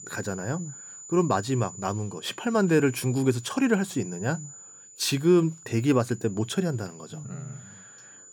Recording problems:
high-pitched whine; noticeable; throughout; 7 kHz, 15 dB below the speech

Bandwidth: 18 kHz